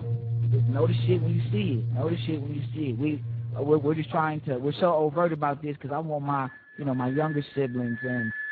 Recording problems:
garbled, watery; badly; nothing above 4 kHz
background music; loud; throughout; 2 dB below the speech

